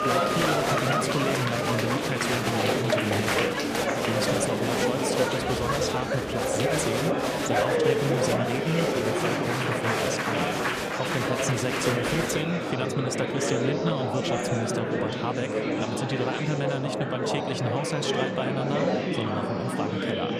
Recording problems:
murmuring crowd; very loud; throughout; 5 dB above the speech

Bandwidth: 14.5 kHz